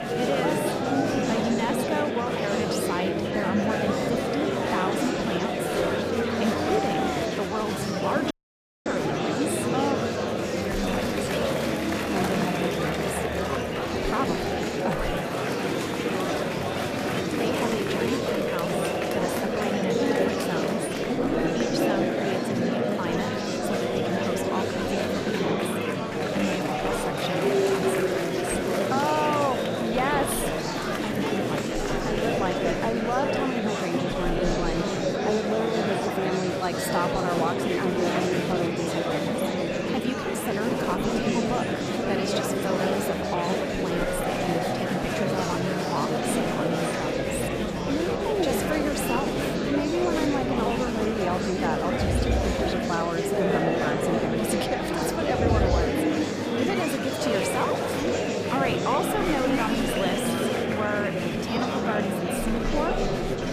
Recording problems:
murmuring crowd; very loud; throughout; 5 dB above the speech
audio cutting out; at 8.5 s for 0.5 s

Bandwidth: 14.5 kHz